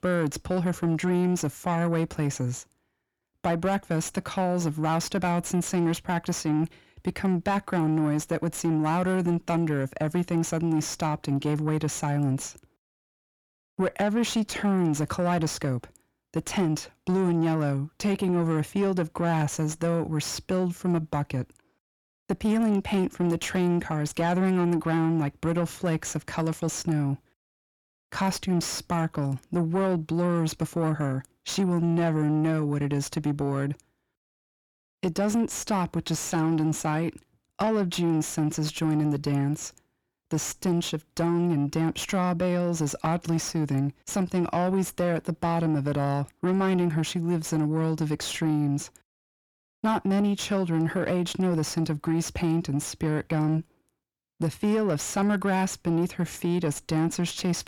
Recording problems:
distortion; slight; 10 dB below the speech

